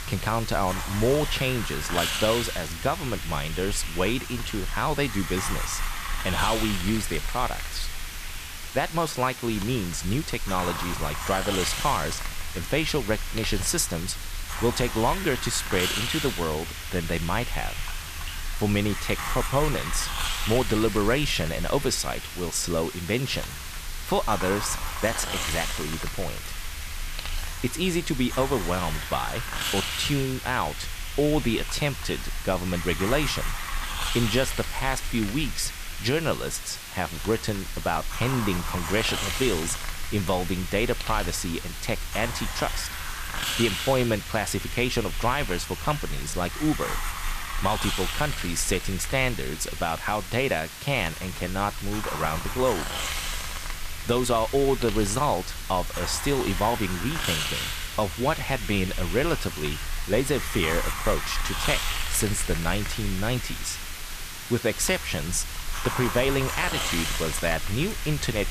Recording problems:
hiss; loud; throughout; 4 dB below the speech

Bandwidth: 14.5 kHz